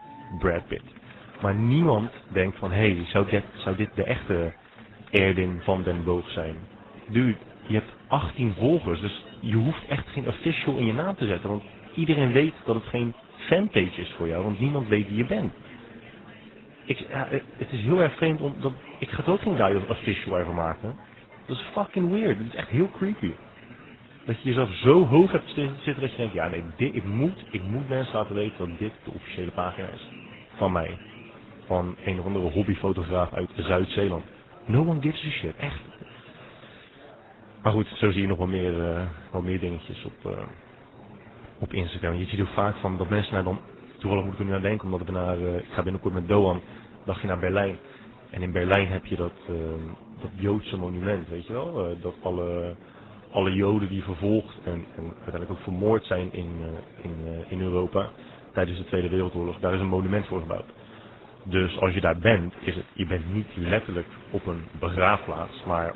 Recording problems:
garbled, watery; badly; nothing above 4 kHz
chatter from many people; faint; throughout; 20 dB below the speech

